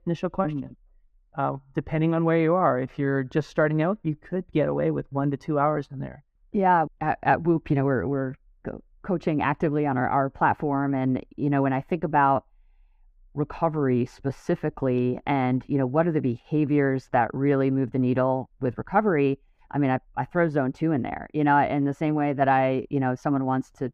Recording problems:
muffled; very; fading above 3 kHz

